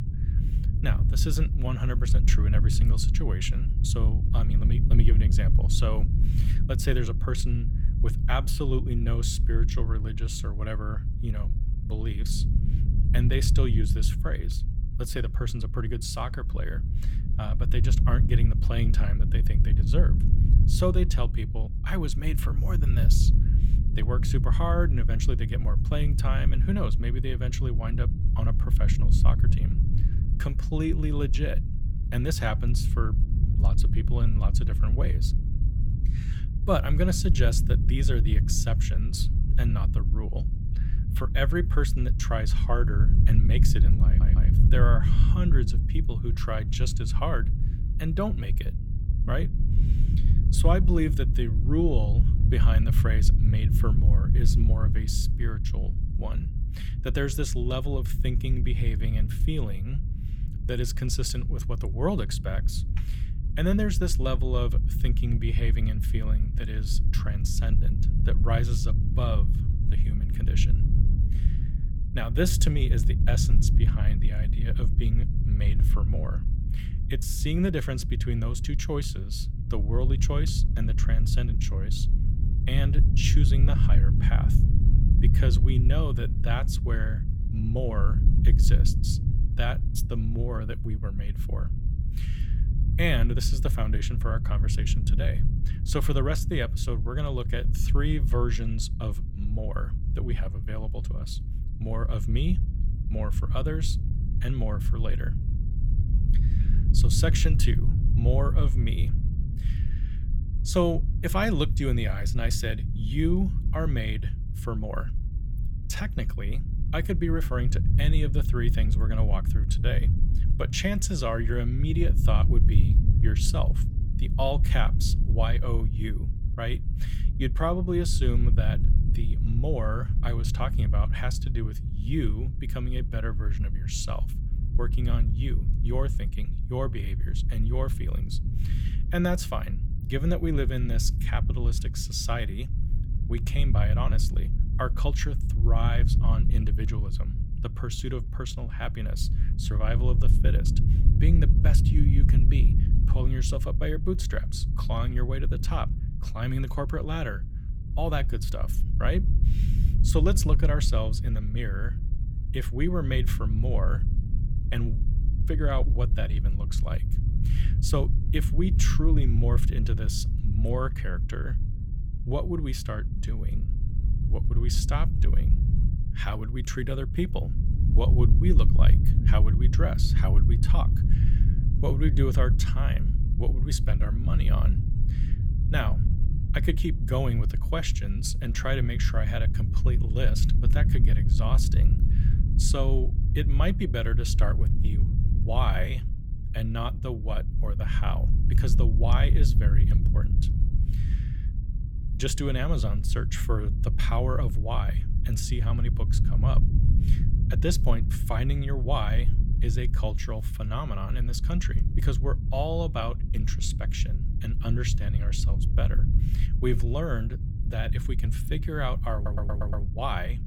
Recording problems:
low rumble; loud; throughout; 8 dB below the speech
audio stuttering; at 44 s and at 3:39

